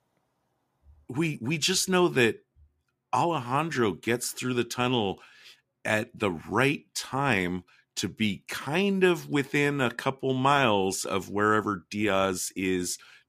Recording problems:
none

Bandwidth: 15 kHz